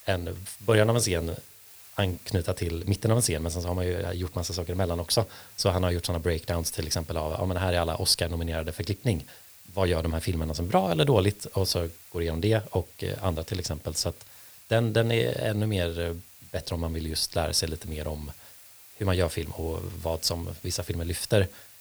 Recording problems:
hiss; noticeable; throughout; 20 dB below the speech

